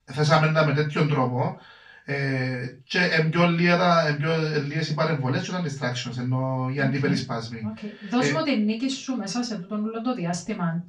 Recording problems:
off-mic speech; far
room echo; slight; dies away in 0.2 s

